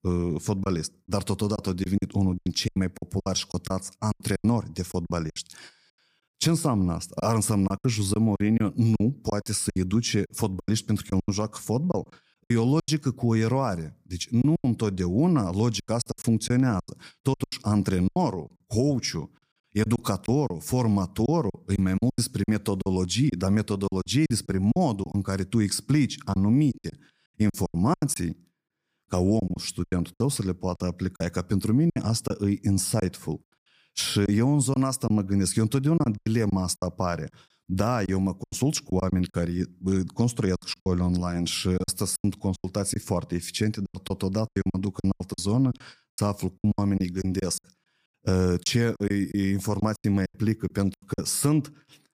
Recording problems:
choppy; very; 12% of the speech affected

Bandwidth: 15 kHz